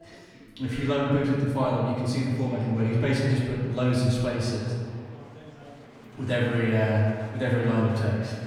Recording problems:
off-mic speech; far
room echo; noticeable; dies away in 1.7 s
chatter from many people; faint; throughout; 20 dB below the speech

